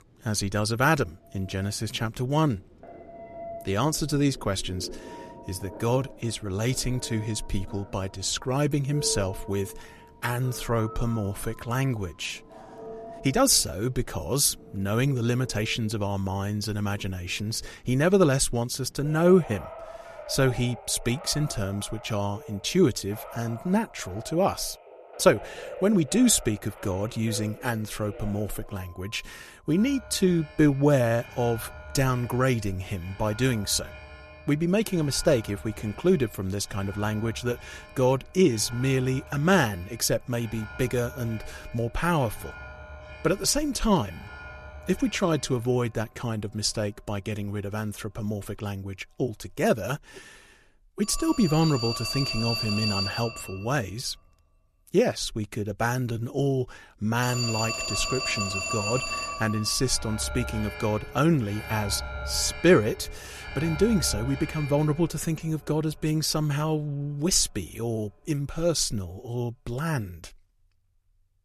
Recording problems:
alarms or sirens; noticeable; throughout; 10 dB below the speech
uneven, jittery; slightly; from 8 s to 1:08

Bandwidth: 13.5 kHz